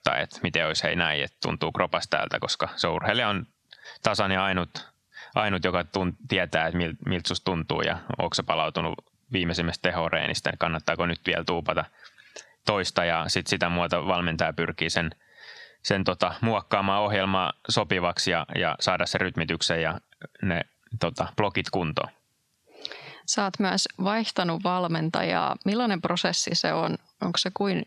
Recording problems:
squashed, flat; somewhat

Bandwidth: 13.5 kHz